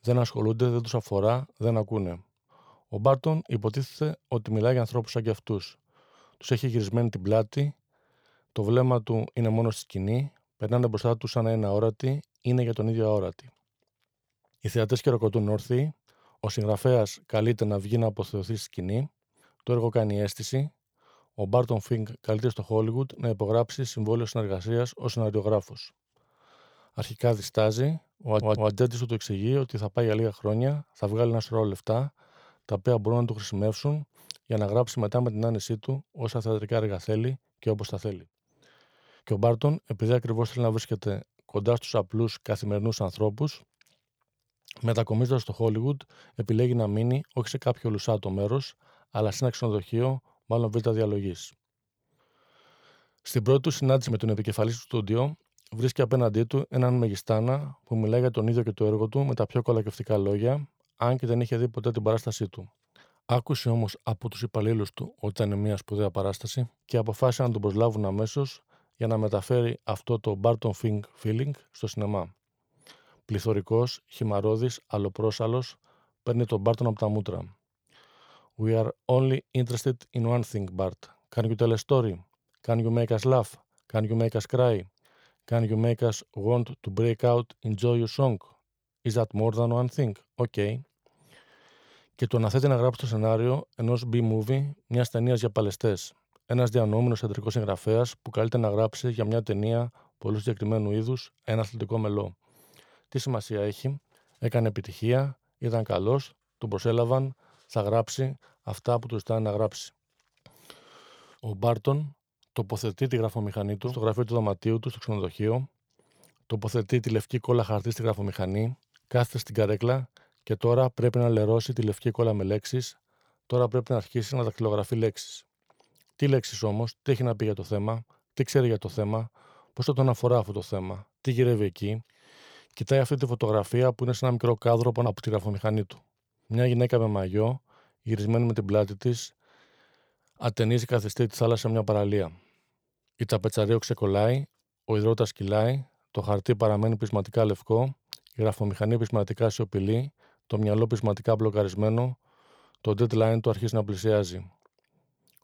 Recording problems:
audio stuttering; at 28 s

